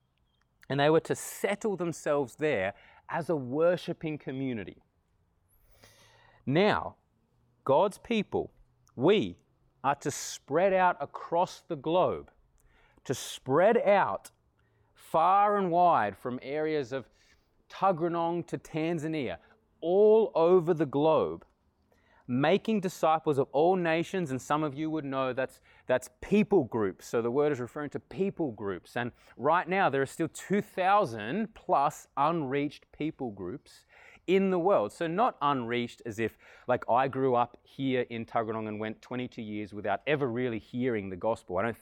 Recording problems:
none

